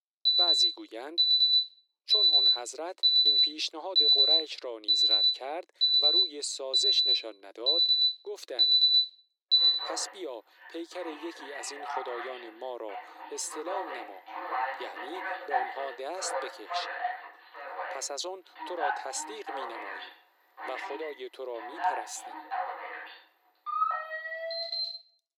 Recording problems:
thin; very; fading below 350 Hz
alarms or sirens; very loud; throughout; 15 dB above the speech

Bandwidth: 18 kHz